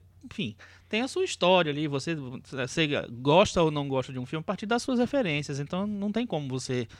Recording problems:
none

